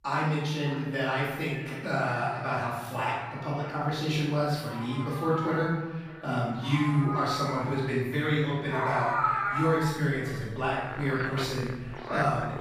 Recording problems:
room echo; strong; dies away in 1.1 s
off-mic speech; far
echo of what is said; faint; throughout; 600 ms later, 20 dB below the speech
animal sounds; loud; throughout; 5 dB below the speech

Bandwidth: 15 kHz